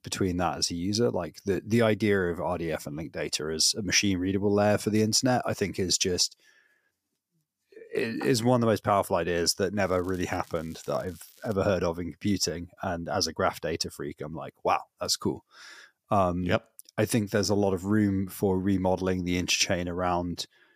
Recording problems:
crackling; faint; from 10 to 12 s; 25 dB below the speech

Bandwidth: 15 kHz